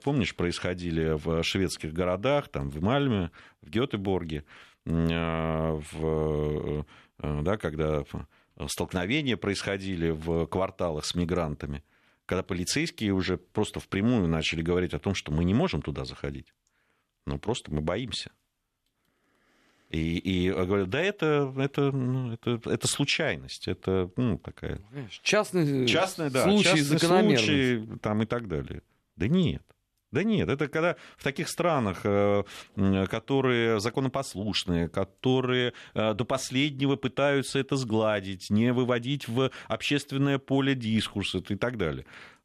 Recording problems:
none

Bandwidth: 13.5 kHz